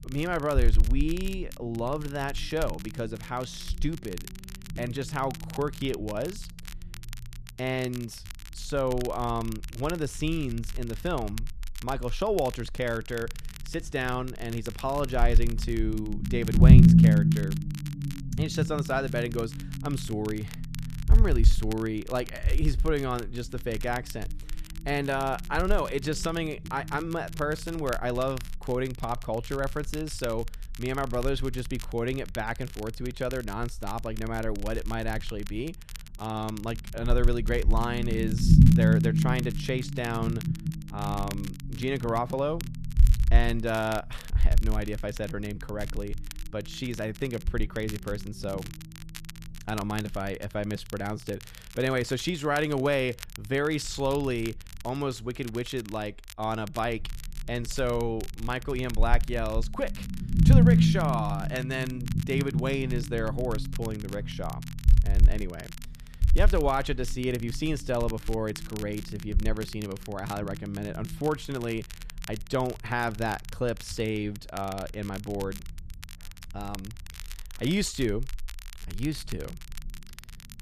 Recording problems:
low rumble; loud; throughout; 4 dB below the speech
crackle, like an old record; noticeable; 15 dB below the speech

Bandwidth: 14.5 kHz